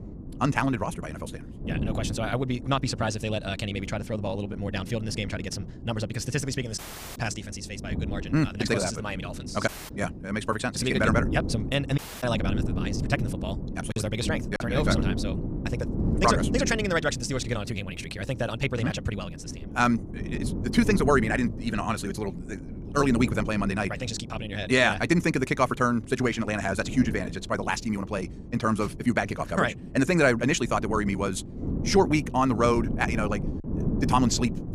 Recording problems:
wrong speed, natural pitch; too fast; 1.8 times normal speed
wind noise on the microphone; occasional gusts; 15 dB below the speech
audio cutting out; at 7 s, at 9.5 s and at 12 s
choppy; occasionally; at 14 s; 2% of the speech affected

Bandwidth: 15 kHz